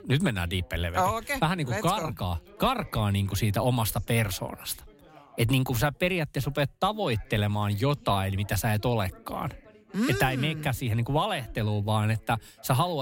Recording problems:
background chatter; faint; throughout; 2 voices, 25 dB below the speech
abrupt cut into speech; at the end

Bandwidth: 16 kHz